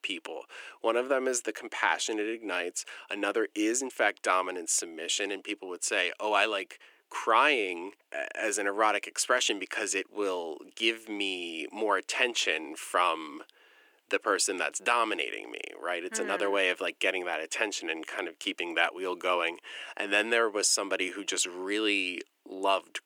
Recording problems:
thin; very; fading below 300 Hz

